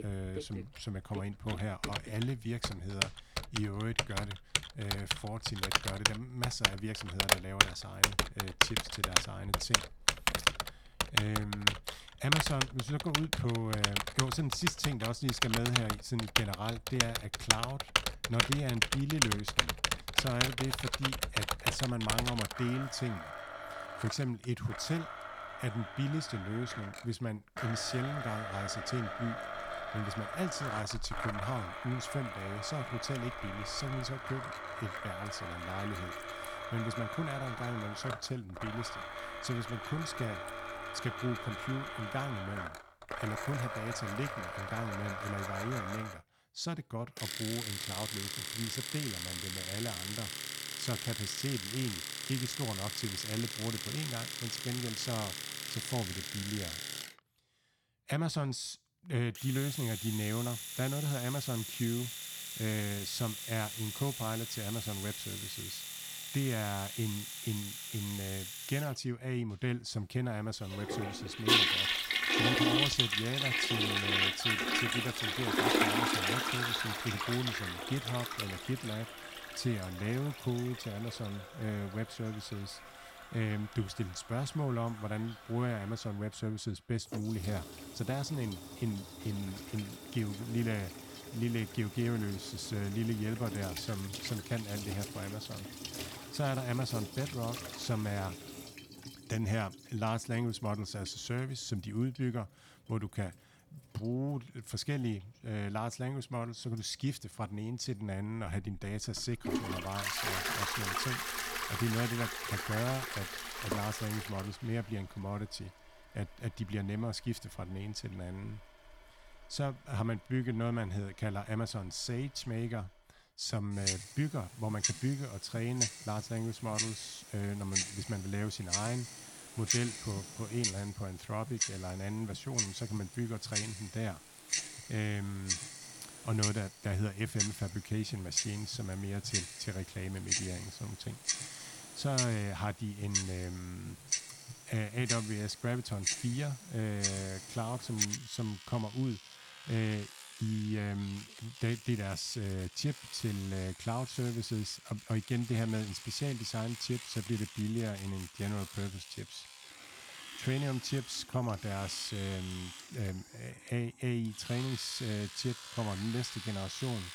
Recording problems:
household noises; very loud; throughout; 2 dB above the speech

